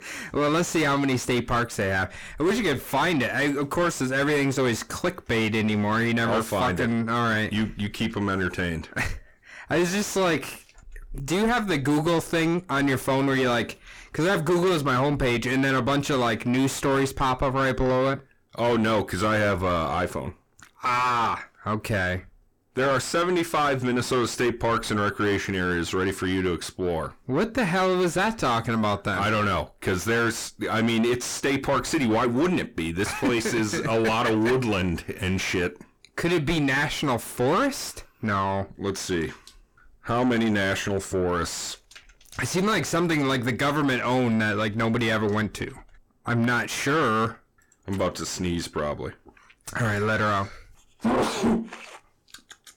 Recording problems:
distortion; heavy; 5 dB below the speech

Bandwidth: 18.5 kHz